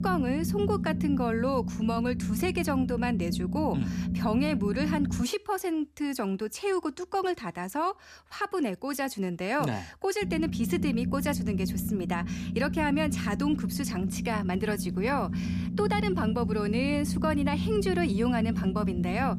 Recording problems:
low rumble; loud; until 5 s and from 10 s on; 8 dB below the speech

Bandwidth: 14.5 kHz